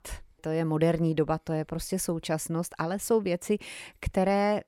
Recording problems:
none

